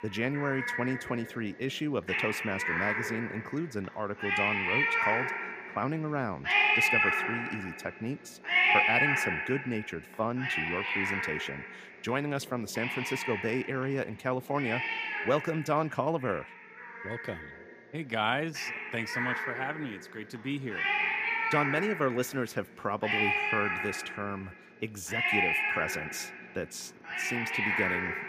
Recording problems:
animal sounds; very loud; throughout; 5 dB above the speech

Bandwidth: 15 kHz